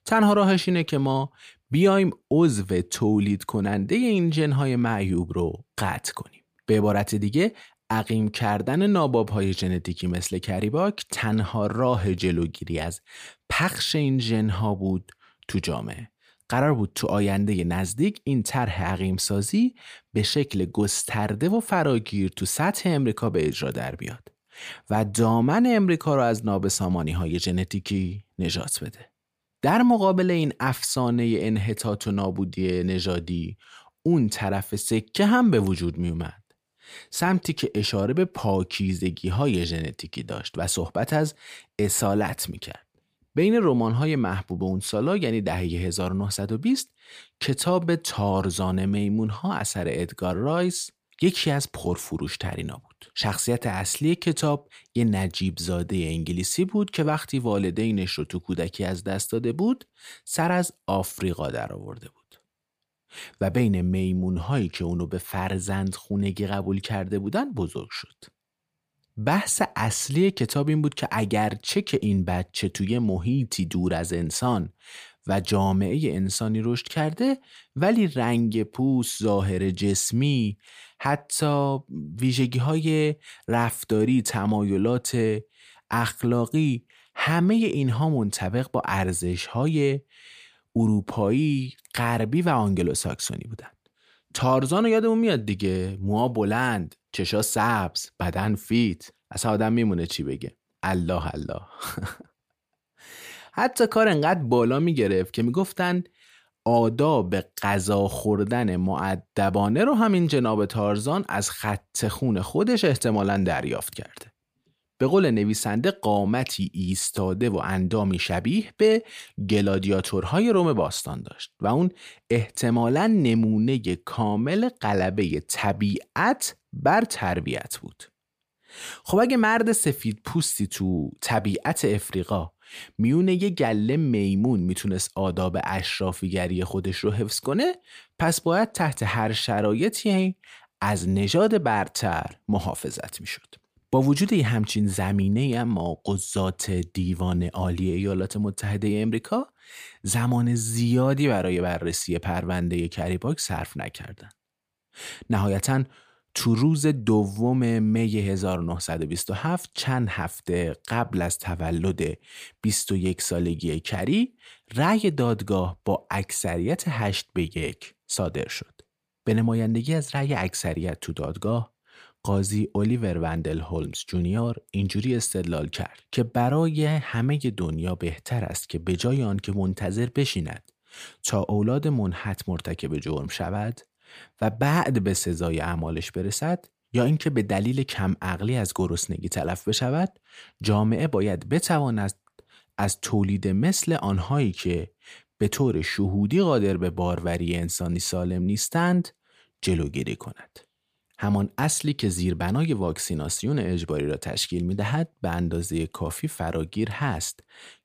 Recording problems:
none

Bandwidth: 15 kHz